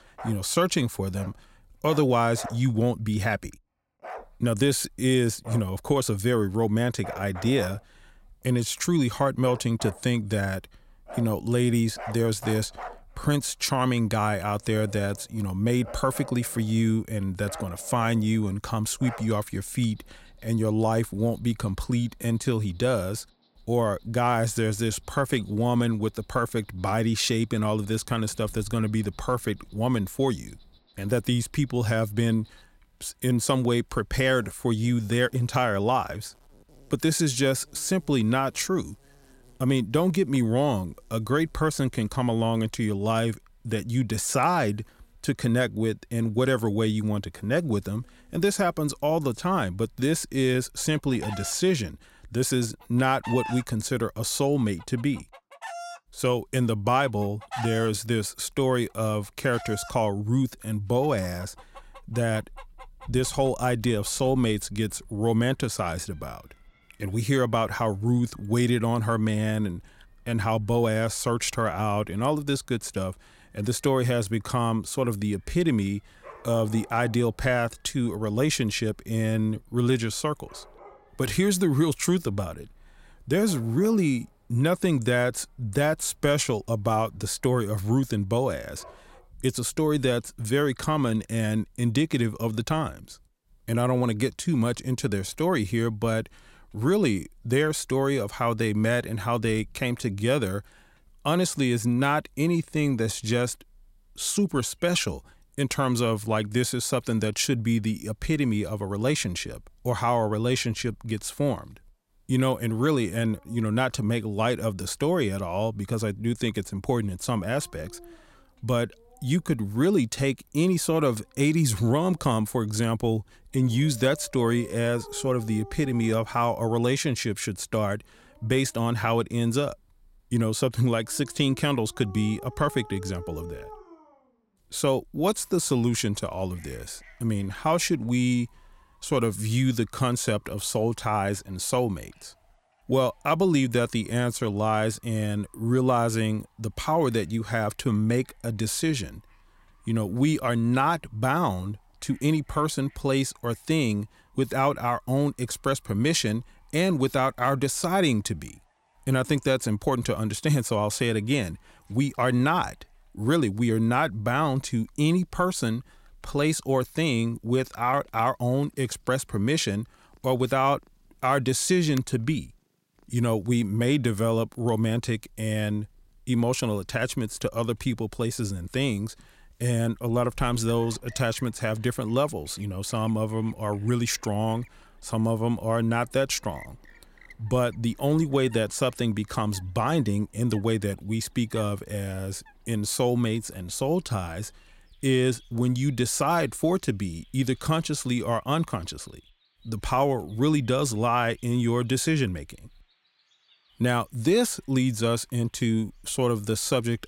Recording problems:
animal sounds; faint; throughout; 20 dB below the speech

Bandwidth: 16 kHz